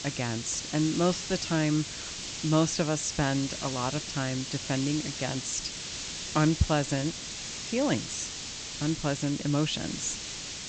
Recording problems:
high frequencies cut off; noticeable; nothing above 8 kHz
hiss; loud; throughout; 6 dB below the speech

